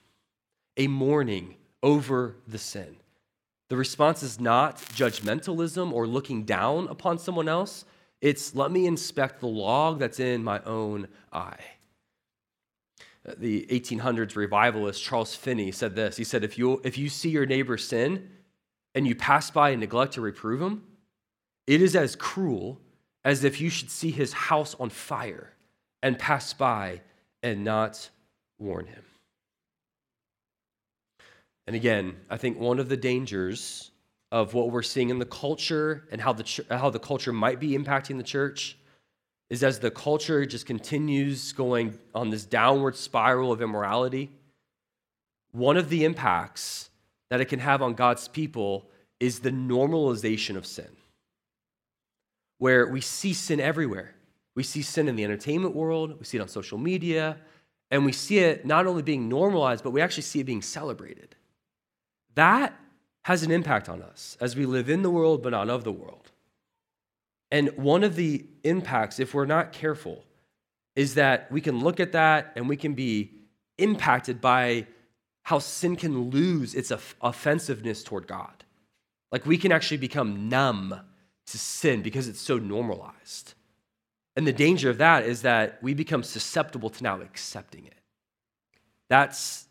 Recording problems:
crackling; noticeable; at 5 s; 15 dB below the speech

